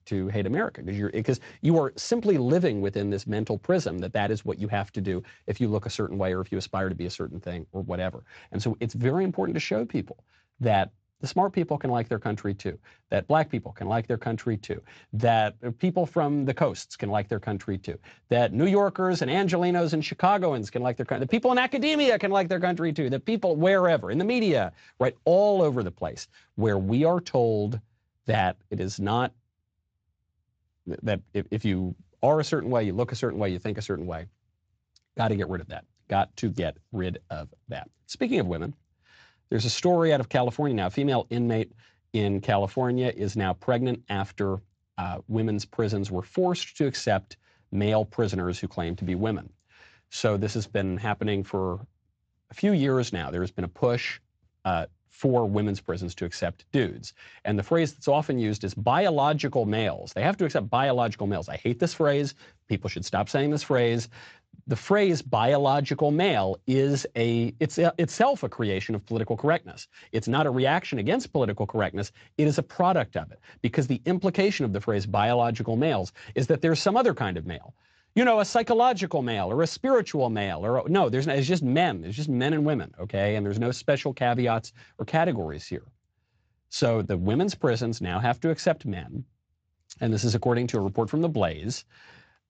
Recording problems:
garbled, watery; slightly; nothing above 7.5 kHz

